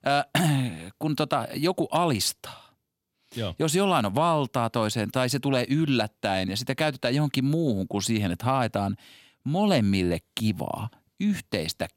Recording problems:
none

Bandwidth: 16.5 kHz